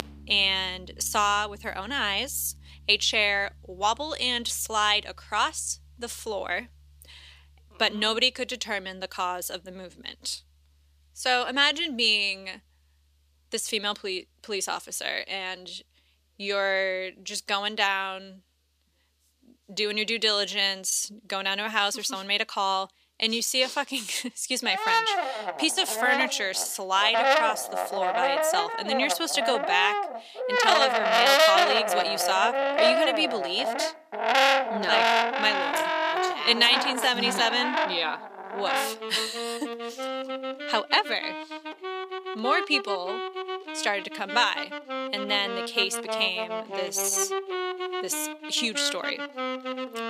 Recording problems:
thin; somewhat; fading below 450 Hz
background music; loud; throughout; 1 dB below the speech

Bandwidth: 14.5 kHz